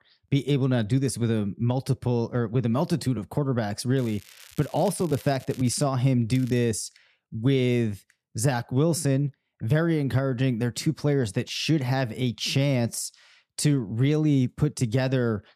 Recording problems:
crackling; faint; from 4 to 6 s and at 6.5 s; 20 dB below the speech

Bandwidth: 14.5 kHz